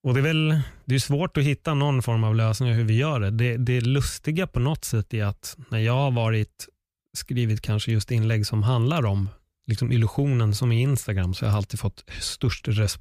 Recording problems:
none

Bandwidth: 15 kHz